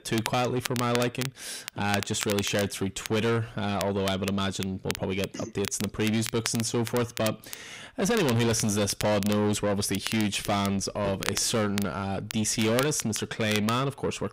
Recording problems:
distortion; heavy; 7 dB below the speech
crackle, like an old record; noticeable; 10 dB below the speech

